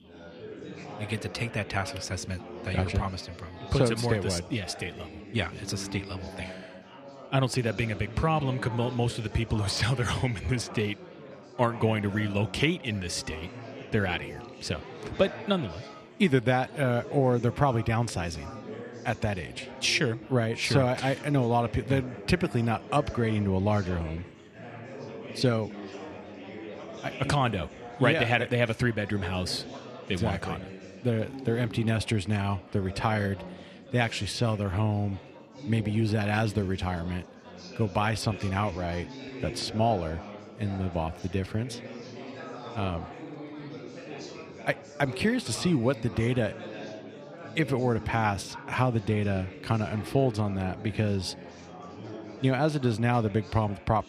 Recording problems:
chatter from many people; noticeable; throughout; 15 dB below the speech

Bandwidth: 14.5 kHz